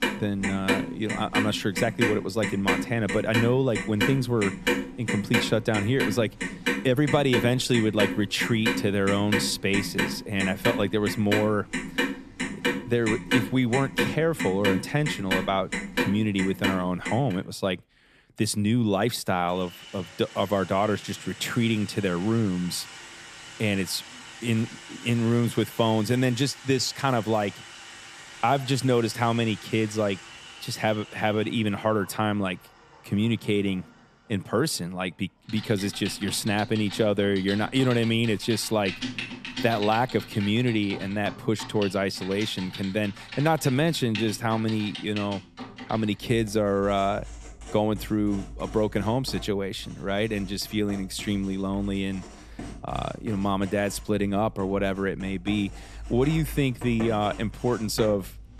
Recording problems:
household noises; loud; throughout; 7 dB below the speech

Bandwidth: 14 kHz